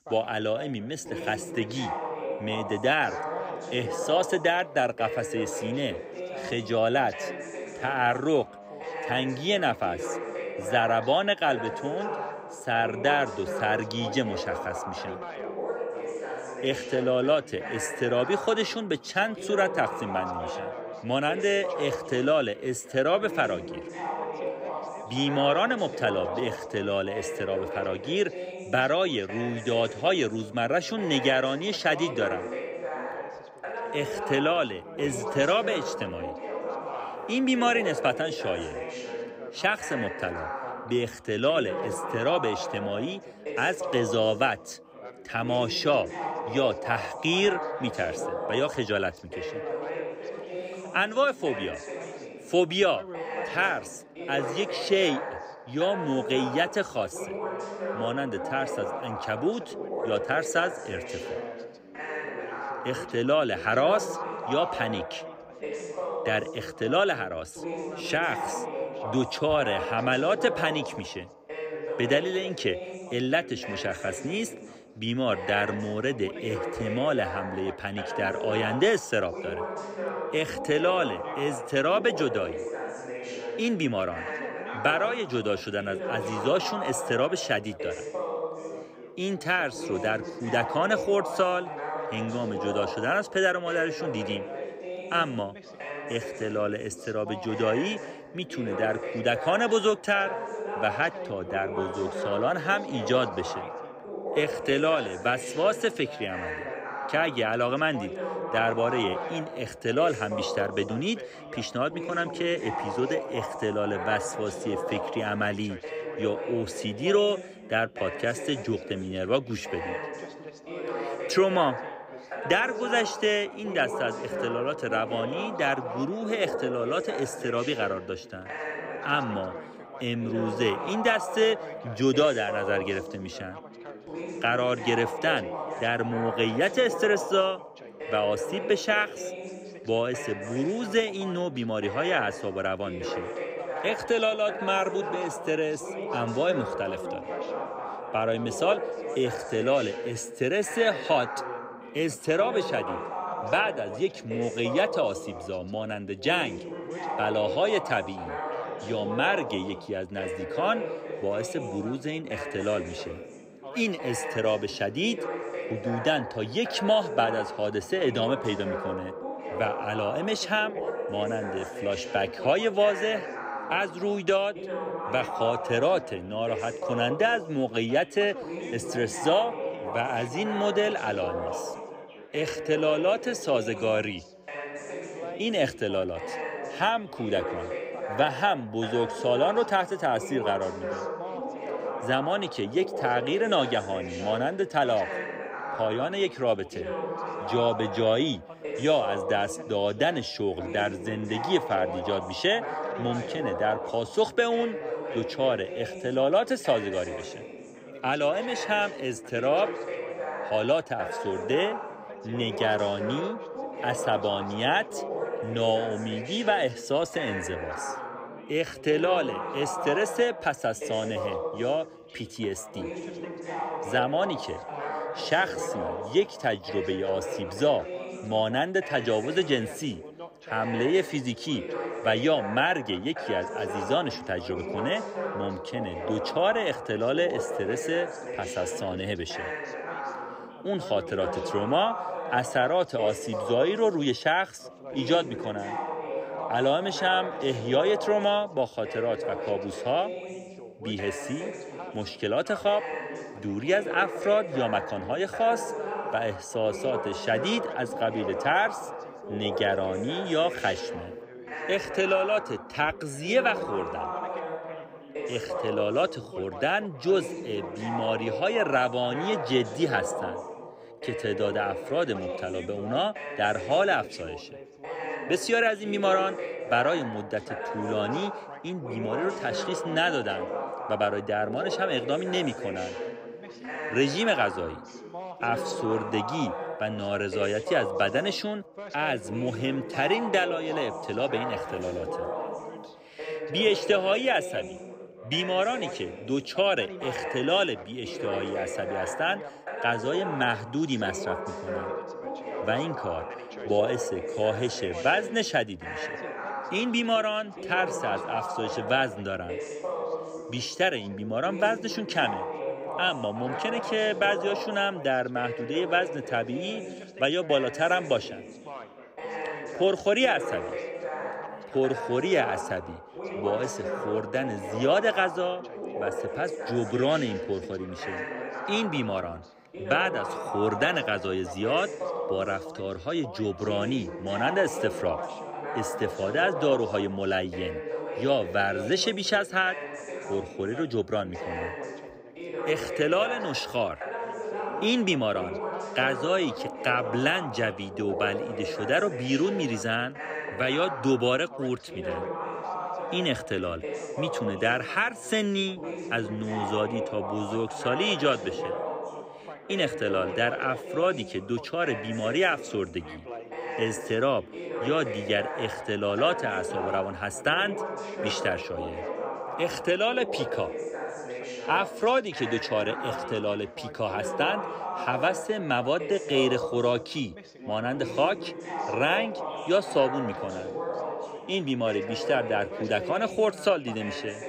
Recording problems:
background chatter; loud; throughout; 3 voices, 7 dB below the speech

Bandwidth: 15.5 kHz